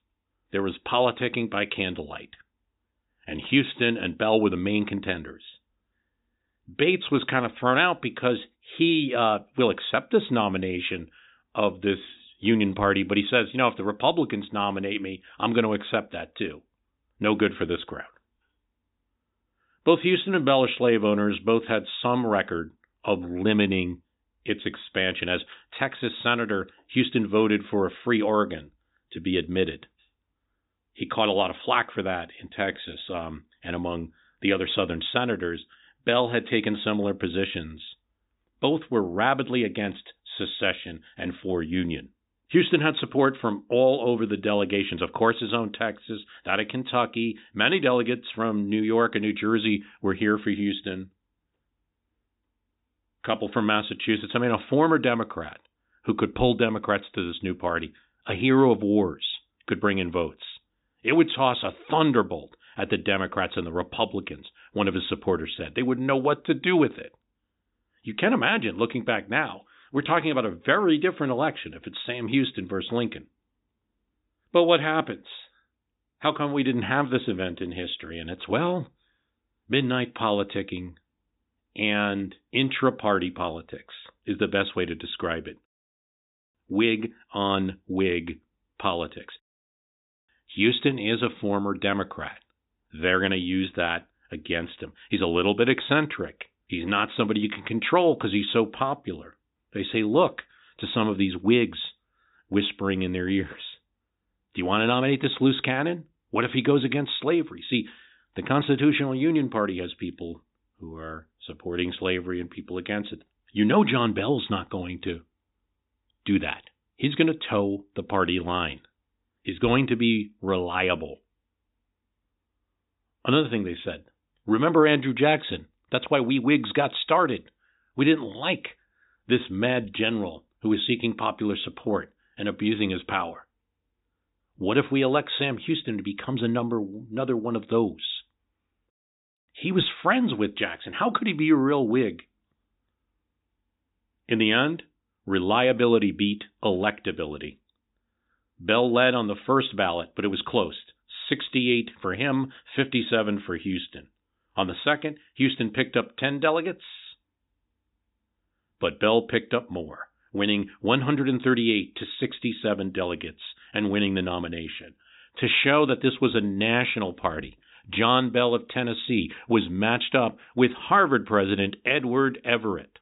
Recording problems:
high frequencies cut off; severe; nothing above 4 kHz

